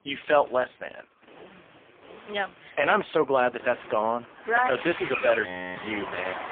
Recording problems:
phone-call audio; poor line
traffic noise; noticeable; throughout; 10 dB below the speech
audio freezing; at 5.5 s

